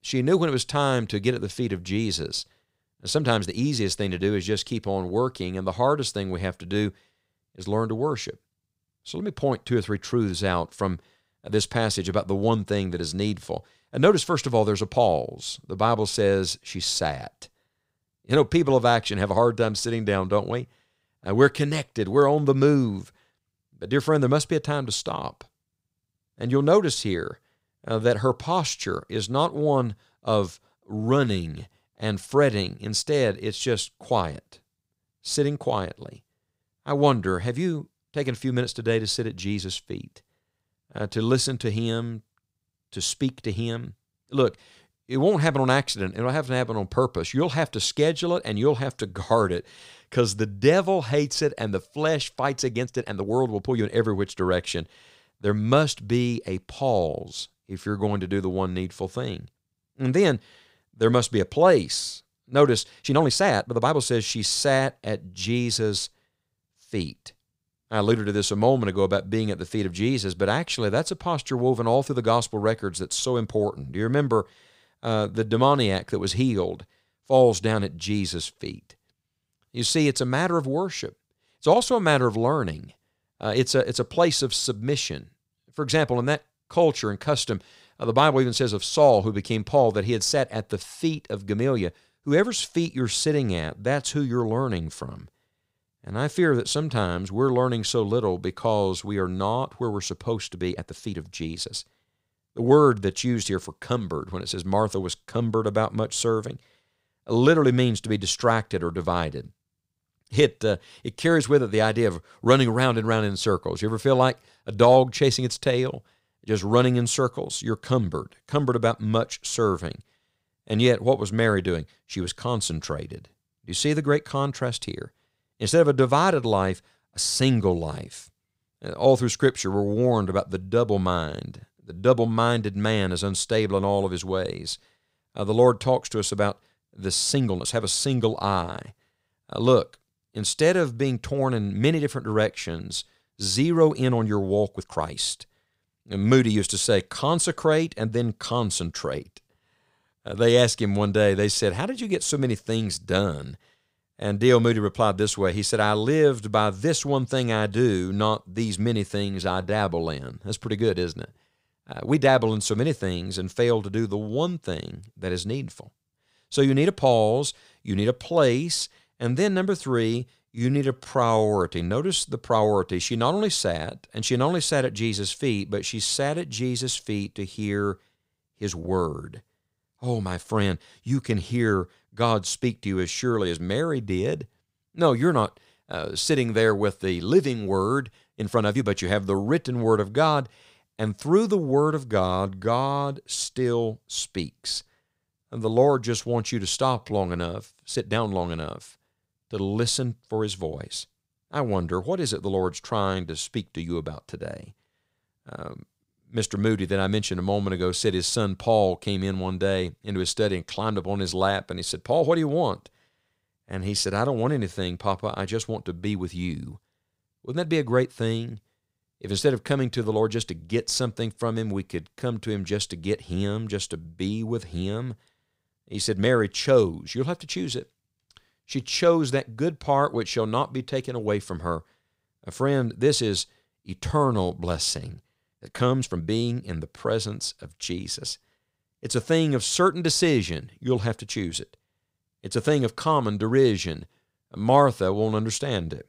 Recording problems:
uneven, jittery; strongly; from 3 s to 3:57

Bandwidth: 15.5 kHz